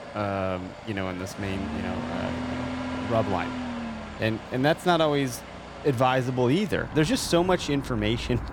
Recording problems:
traffic noise; loud; throughout; 9 dB below the speech

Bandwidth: 18 kHz